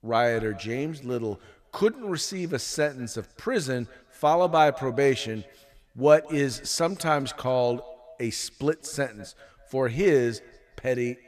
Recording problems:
echo of what is said; faint; throughout; 190 ms later, 20 dB below the speech

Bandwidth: 14.5 kHz